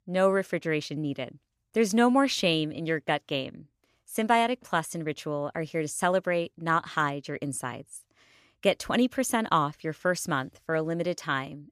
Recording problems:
none

